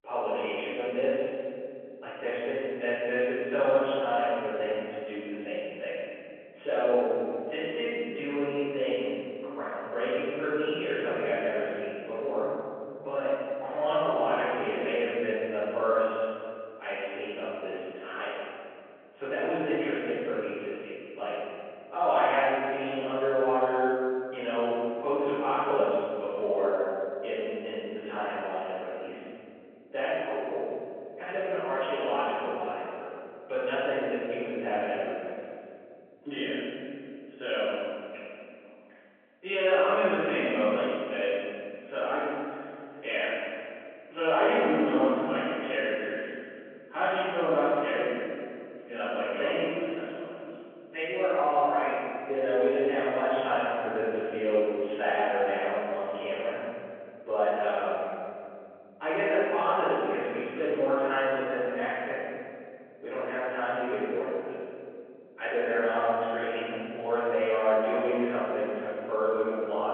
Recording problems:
room echo; strong; dies away in 2.5 s
off-mic speech; far
phone-call audio

